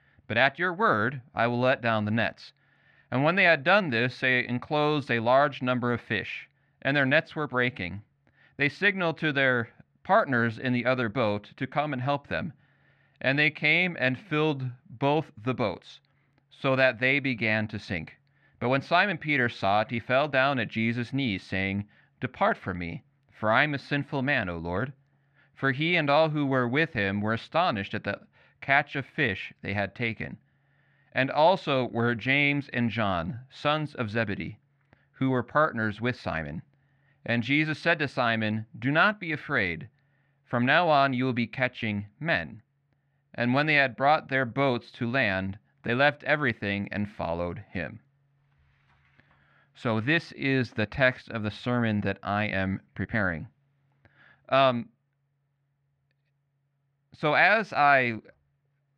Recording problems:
muffled; slightly; fading above 2 kHz

